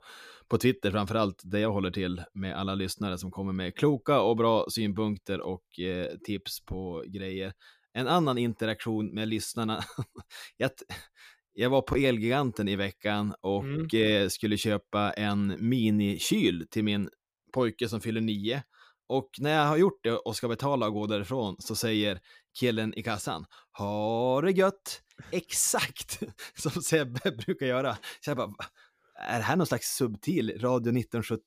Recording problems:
none

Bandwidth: 15 kHz